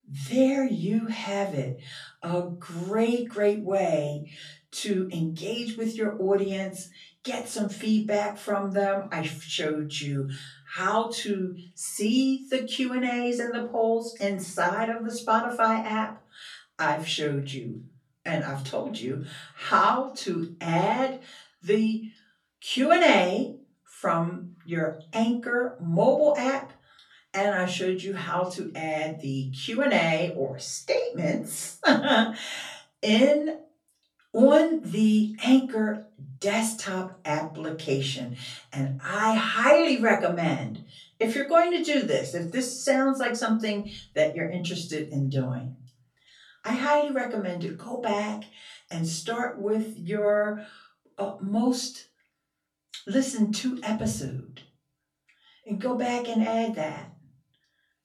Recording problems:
off-mic speech; far
room echo; slight; dies away in 0.4 s

